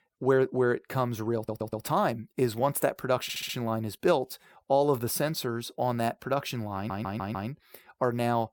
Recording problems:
audio stuttering; at 1.5 s, at 3 s and at 7 s

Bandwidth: 17.5 kHz